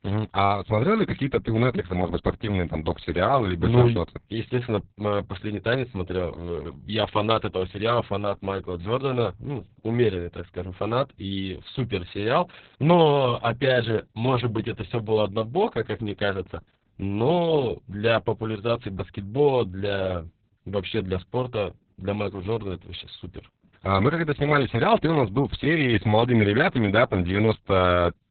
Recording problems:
garbled, watery; badly; nothing above 4 kHz

